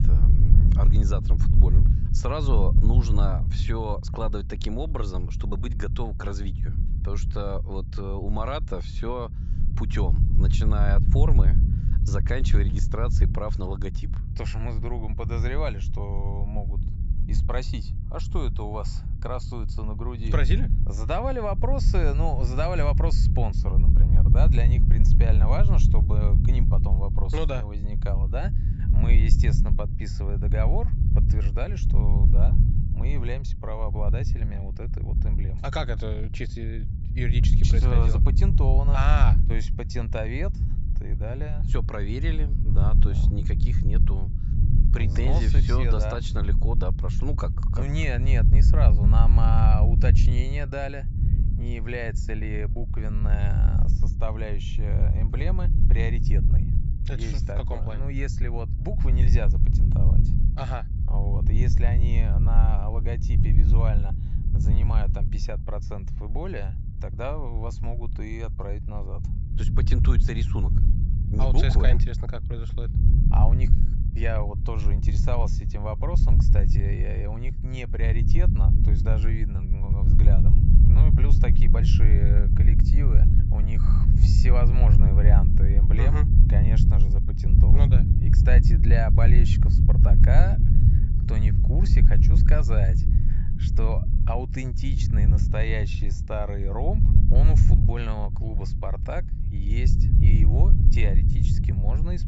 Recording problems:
high frequencies cut off; noticeable; nothing above 8 kHz
low rumble; loud; throughout; 4 dB below the speech

